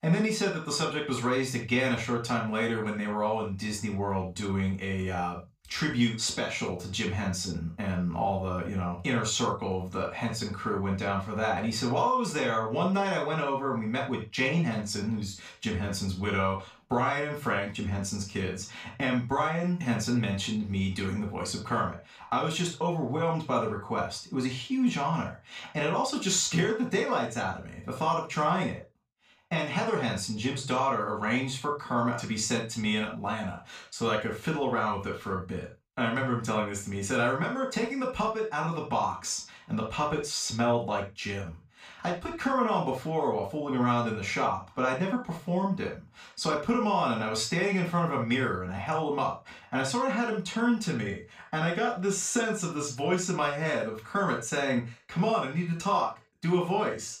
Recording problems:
off-mic speech; far
room echo; noticeable; dies away in 0.3 s

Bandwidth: 15 kHz